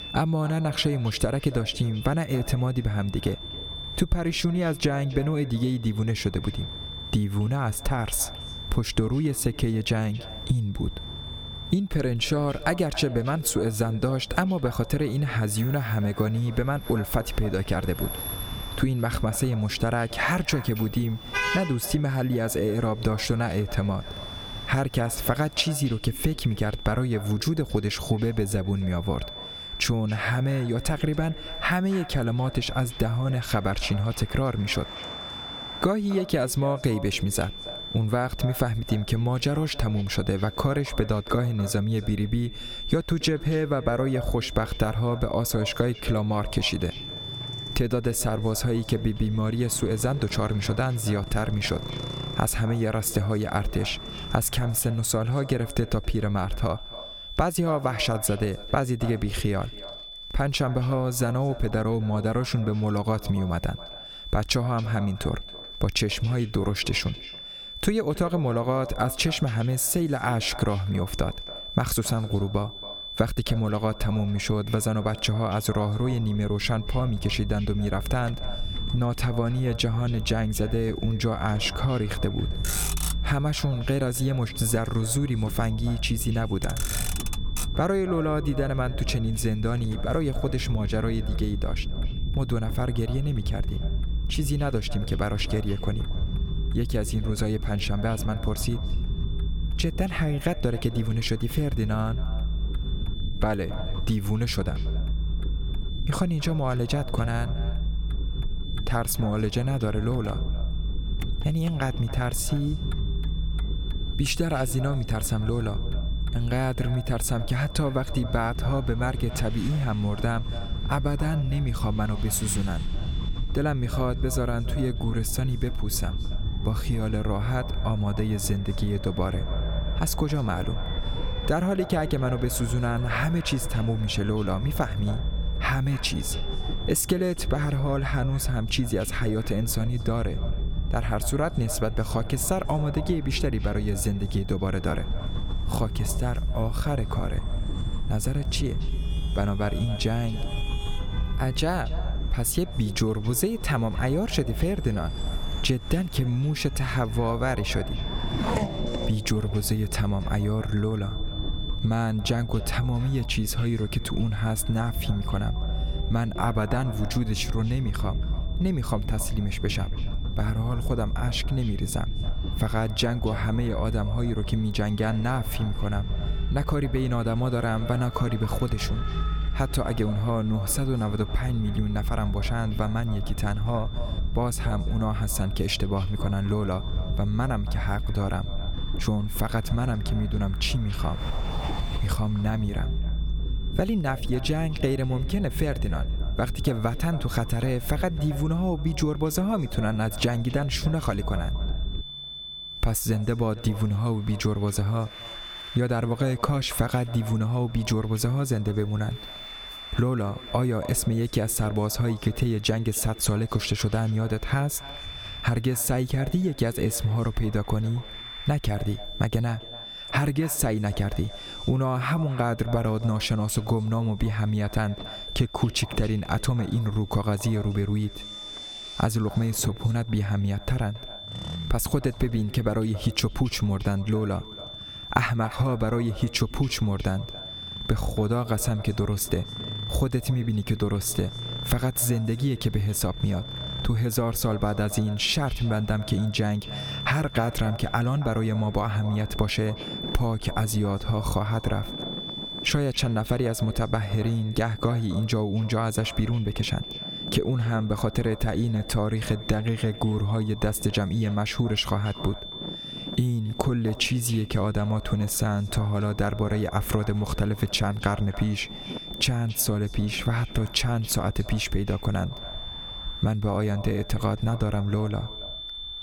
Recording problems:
echo of what is said; faint; throughout; 280 ms later, 20 dB below the speech
squashed, flat; somewhat, background pumping
high-pitched whine; noticeable; throughout; 3.5 kHz, 15 dB below the speech
traffic noise; noticeable; throughout; 15 dB below the speech
low rumble; noticeable; from 1:16 to 3:22; 20 dB below the speech

